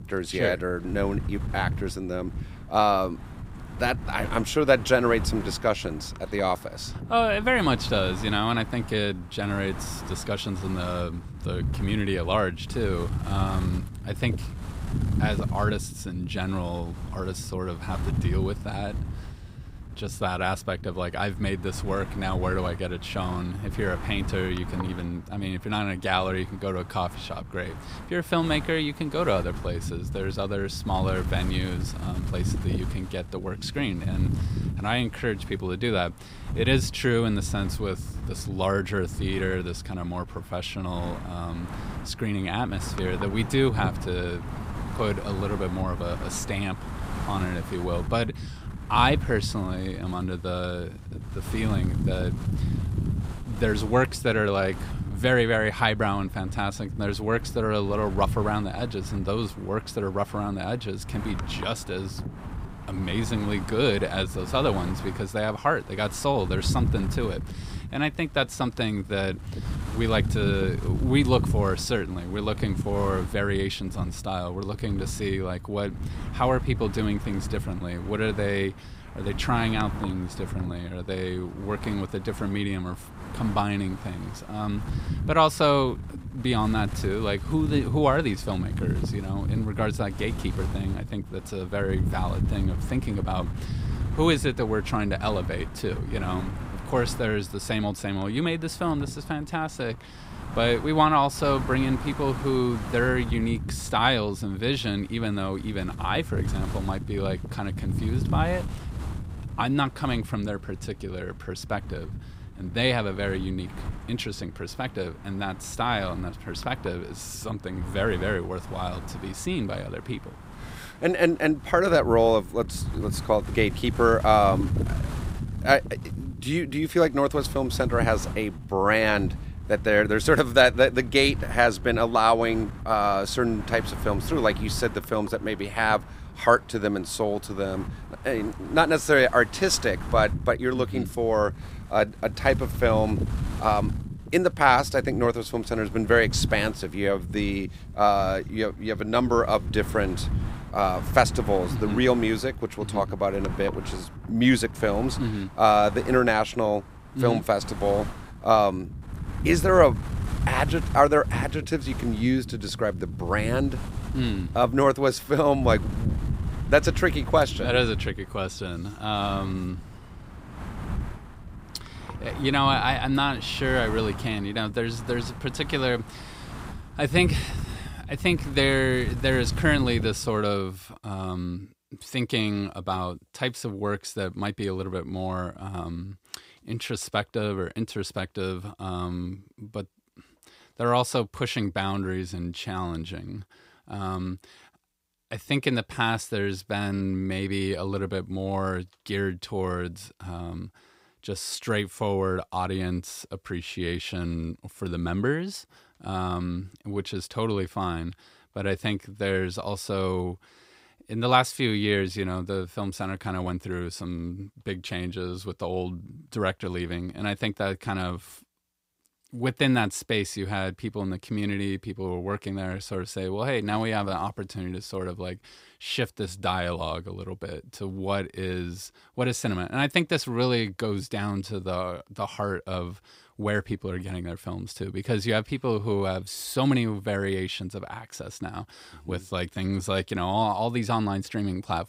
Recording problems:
wind noise on the microphone; occasional gusts; until 3:00; 15 dB below the speech

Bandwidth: 15.5 kHz